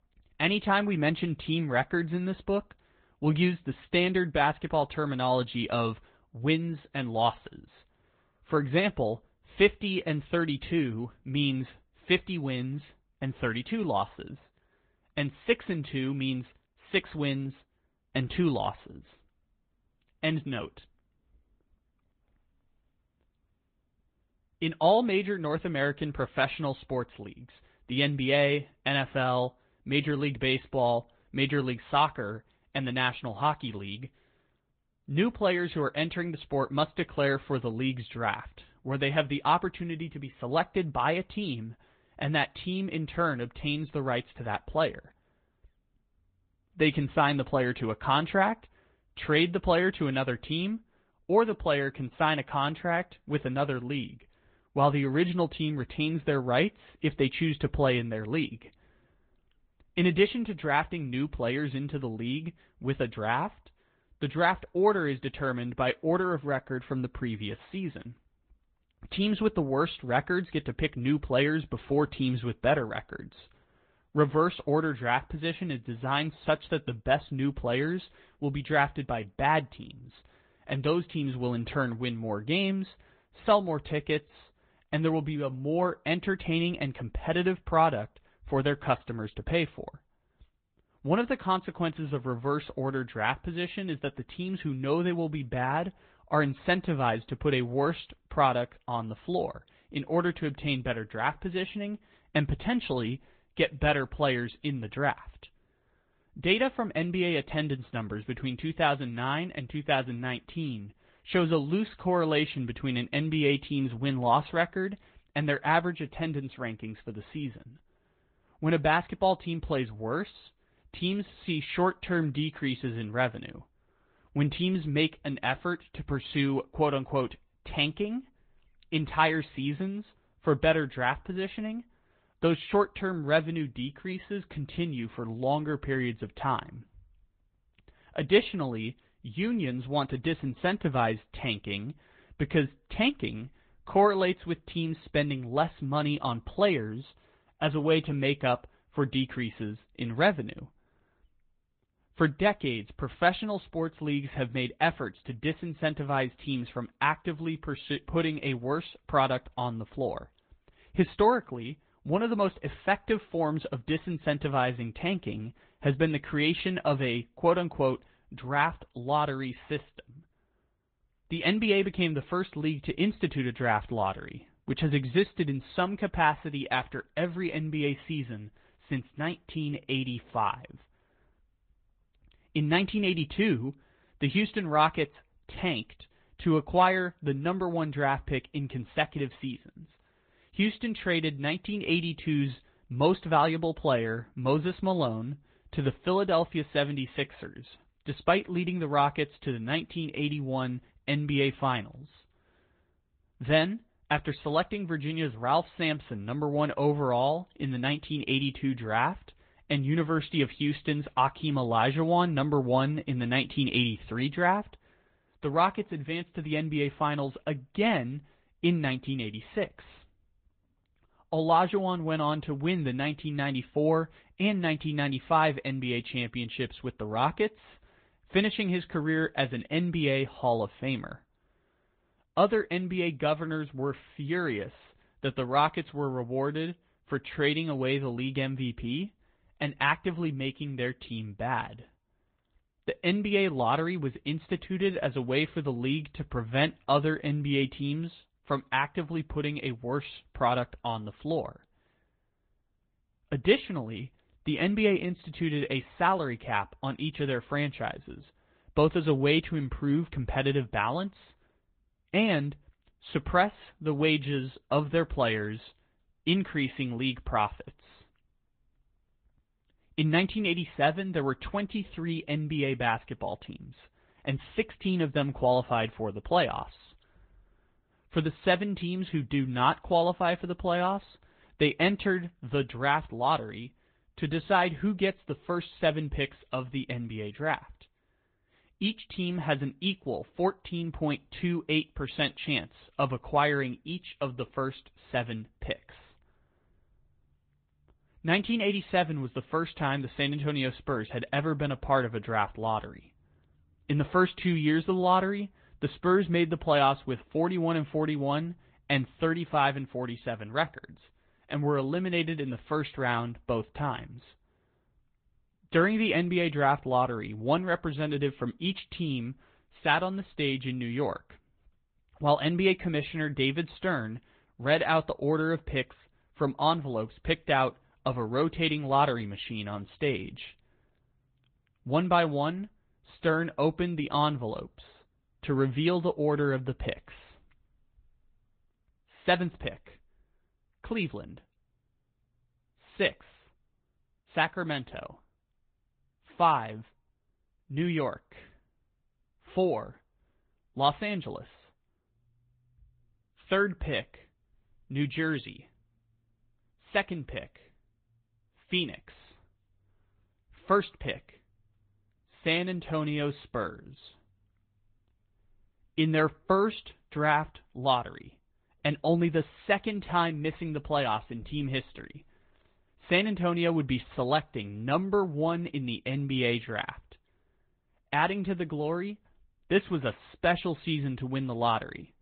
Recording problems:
high frequencies cut off; severe; nothing above 4 kHz
garbled, watery; slightly

